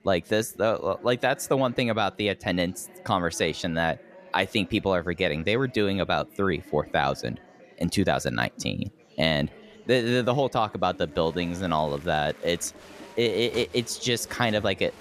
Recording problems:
murmuring crowd; faint; throughout; 20 dB below the speech

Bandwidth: 14 kHz